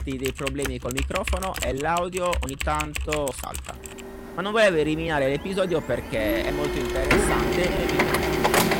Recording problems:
distortion; slight; 10 dB below the speech
household noises; loud; throughout; as loud as the speech
uneven, jittery; strongly; from 1 to 8 s

